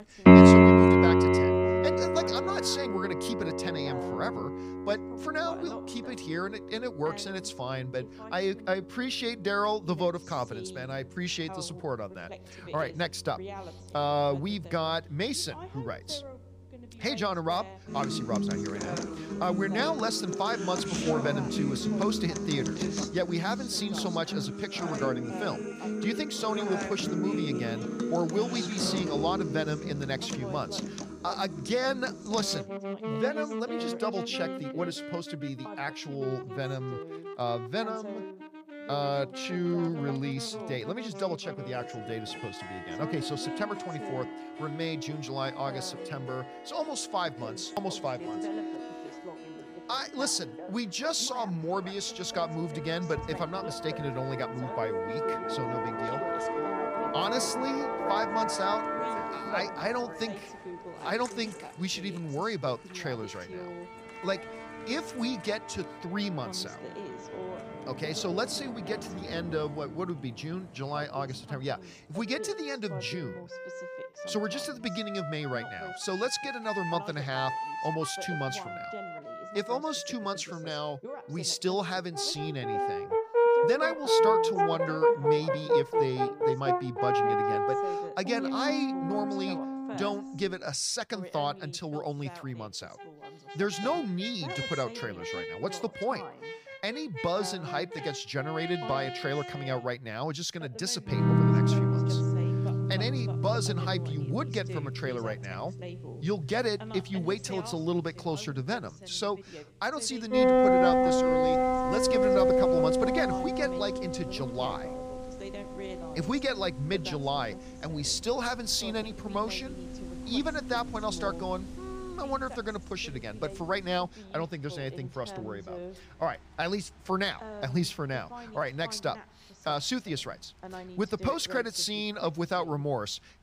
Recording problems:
background music; very loud; throughout; 4 dB above the speech
voice in the background; noticeable; throughout; 15 dB below the speech

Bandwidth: 15 kHz